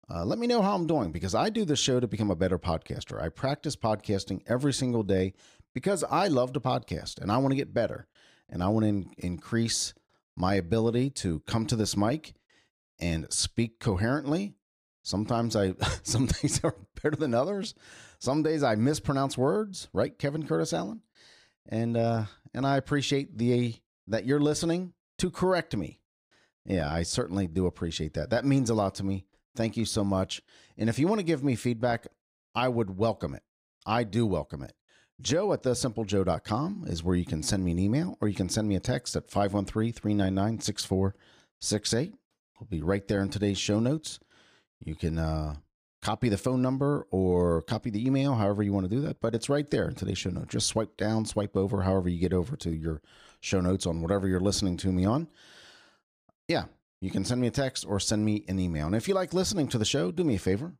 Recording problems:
none

